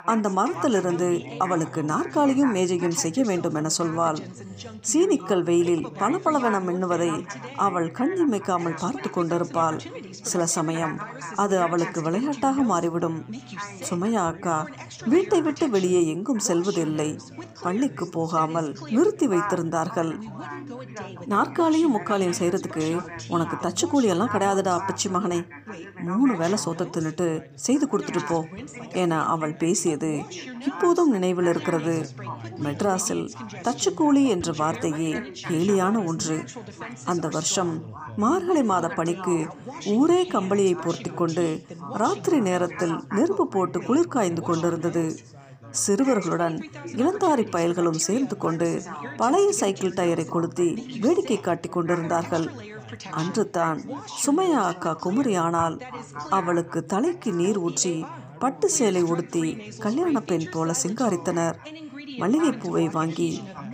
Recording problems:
background chatter; noticeable; throughout; 3 voices, 15 dB below the speech

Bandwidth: 15 kHz